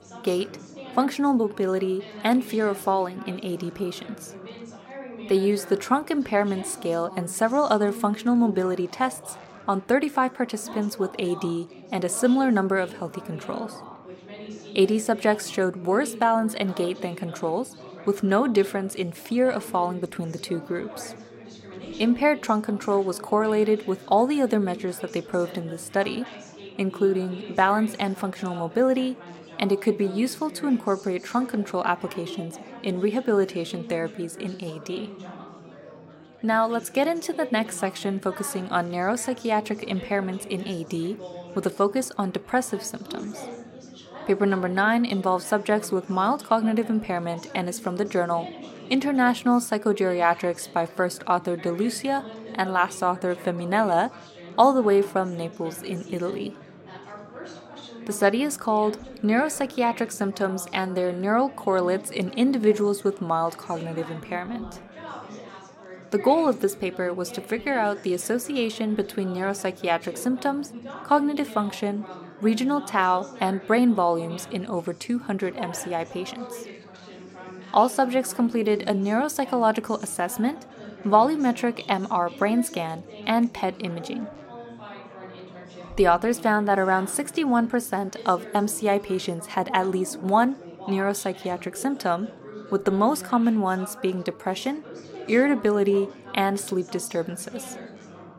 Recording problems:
chatter from many people; noticeable; throughout; 15 dB below the speech

